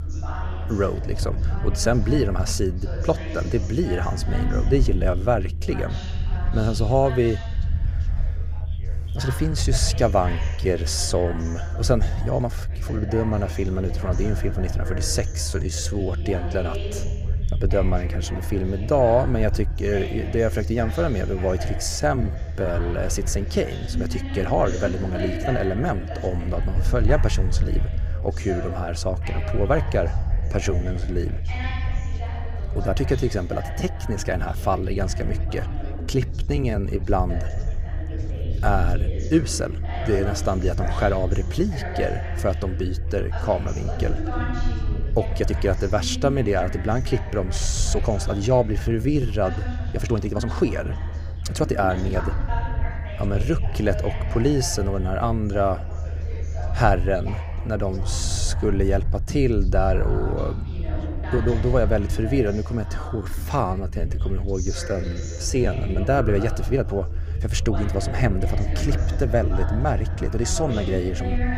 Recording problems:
background chatter; noticeable; throughout; 3 voices, 10 dB below the speech
low rumble; noticeable; throughout; 20 dB below the speech
uneven, jittery; strongly; from 9 s to 1:07

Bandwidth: 15.5 kHz